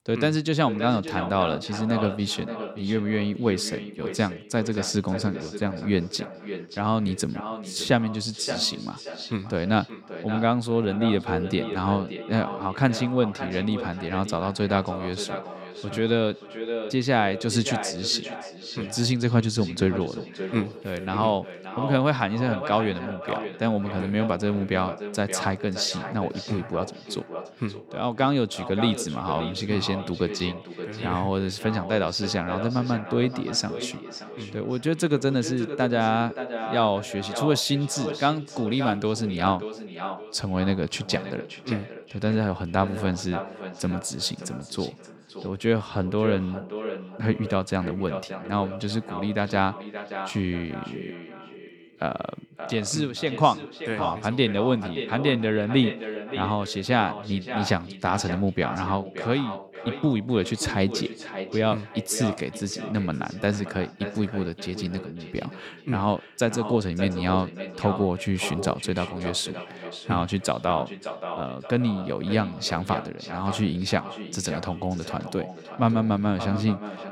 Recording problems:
echo of what is said; strong; throughout; 580 ms later, 10 dB below the speech

